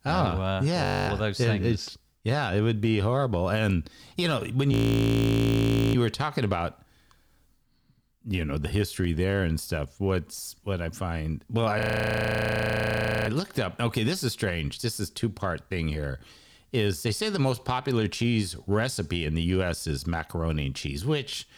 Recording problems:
audio freezing; at 1 s, at 4.5 s for 1 s and at 12 s for 1.5 s

